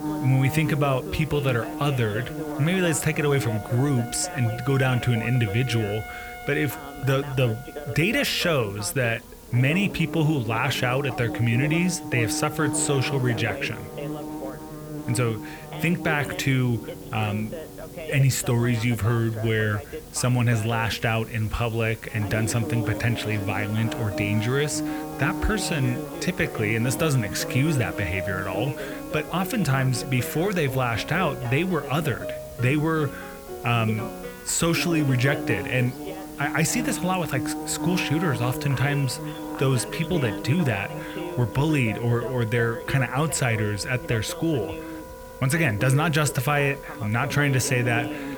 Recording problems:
electrical hum; noticeable; throughout; 60 Hz, 10 dB below the speech
background music; noticeable; throughout; 15 dB below the speech
voice in the background; noticeable; throughout; 15 dB below the speech
hiss; faint; throughout; 20 dB below the speech

